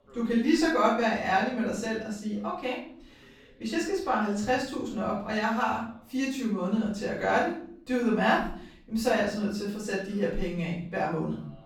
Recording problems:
off-mic speech; far
room echo; noticeable; dies away in 0.6 s
voice in the background; faint; throughout; 30 dB below the speech

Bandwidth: 17.5 kHz